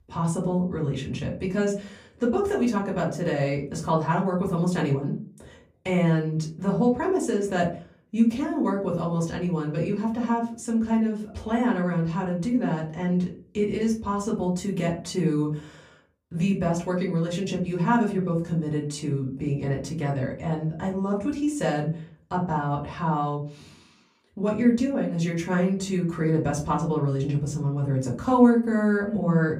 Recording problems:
off-mic speech; far
room echo; slight; dies away in 0.4 s

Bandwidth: 15.5 kHz